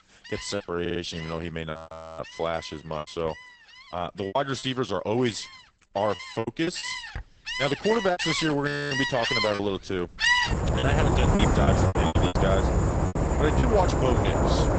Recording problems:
garbled, watery; badly; nothing above 8 kHz
animal sounds; very loud; throughout; 3 dB above the speech
choppy; very; 9% of the speech affected
audio stuttering; at 1 s
audio freezing; at 1.5 s and at 8.5 s

